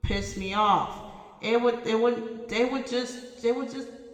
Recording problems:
room echo; noticeable; dies away in 1.4 s
off-mic speech; somewhat distant

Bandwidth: 18 kHz